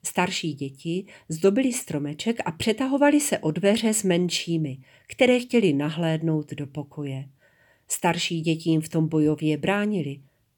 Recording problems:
none

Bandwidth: 18.5 kHz